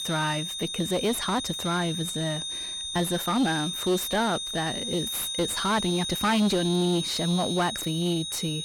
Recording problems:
distortion; slight; 9 dB below the speech
high-pitched whine; loud; throughout; 3.5 kHz, 3 dB below the speech
uneven, jittery; strongly; from 0.5 to 8 s

